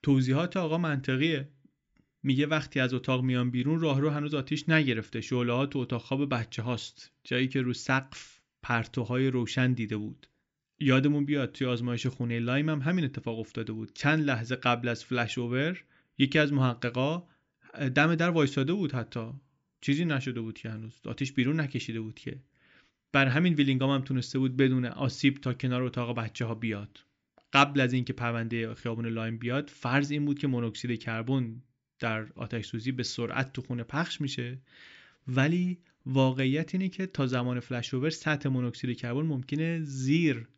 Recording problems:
high frequencies cut off; noticeable; nothing above 8 kHz

